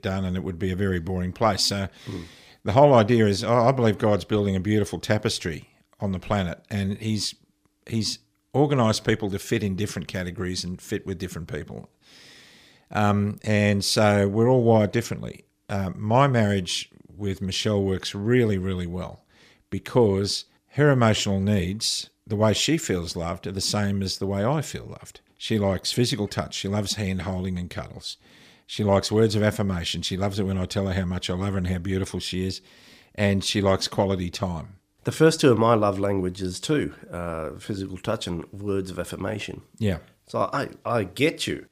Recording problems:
none

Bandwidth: 15 kHz